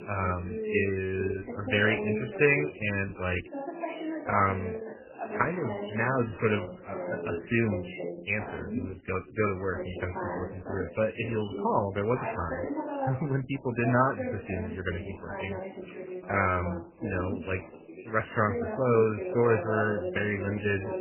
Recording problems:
garbled, watery; badly; nothing above 2.5 kHz
background chatter; loud; throughout; 2 voices, 7 dB below the speech

